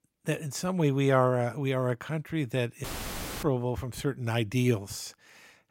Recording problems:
audio cutting out; filled with static; at 3 s for 0.5 s

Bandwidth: 16 kHz